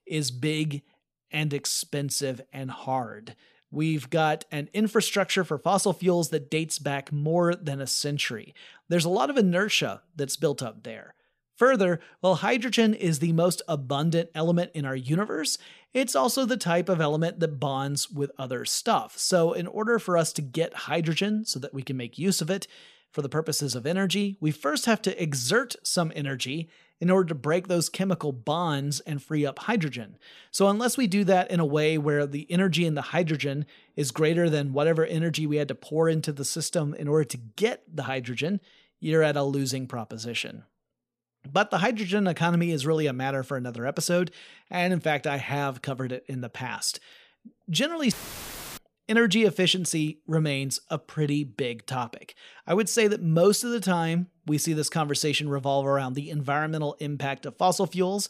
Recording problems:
audio cutting out; filled with static; at 48 s for 0.5 s

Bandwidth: 15 kHz